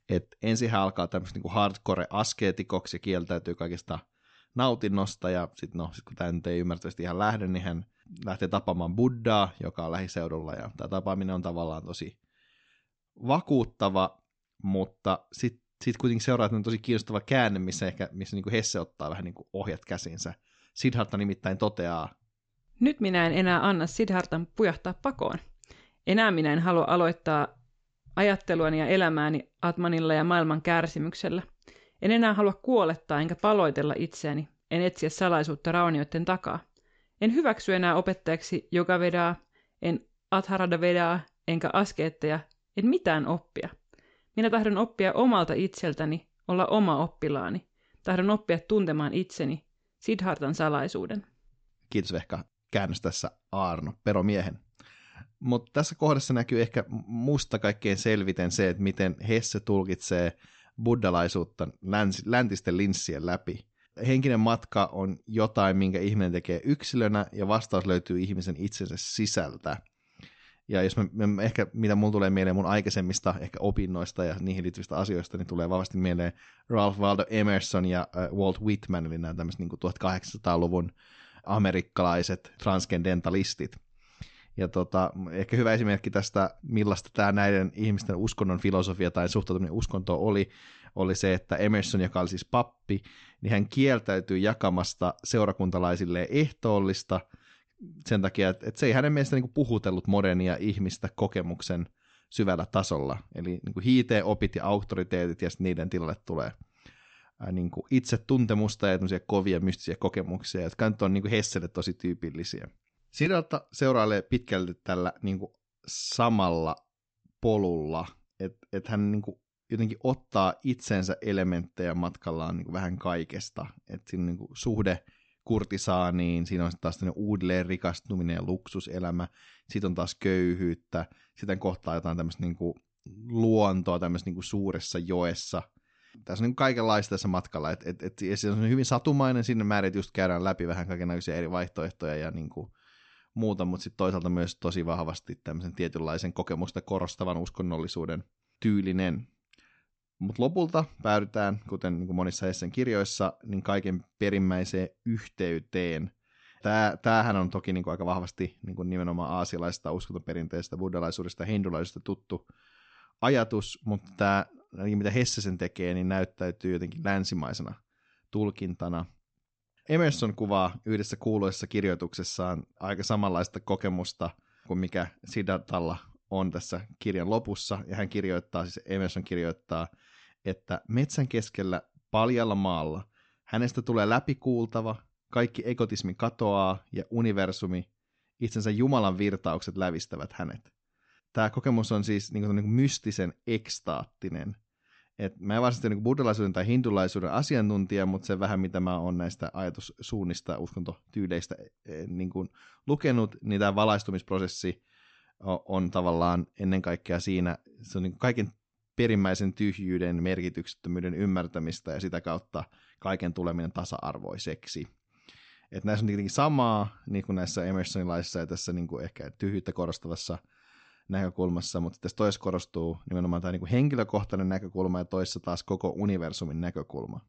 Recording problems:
high frequencies cut off; noticeable; nothing above 8 kHz

